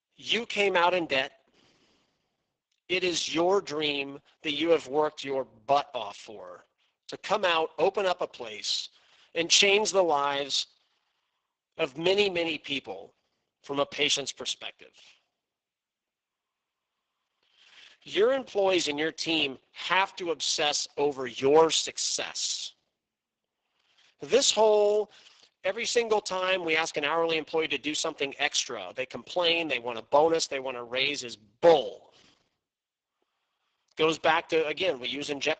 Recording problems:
garbled, watery; badly; nothing above 7.5 kHz
thin; somewhat; fading below 450 Hz

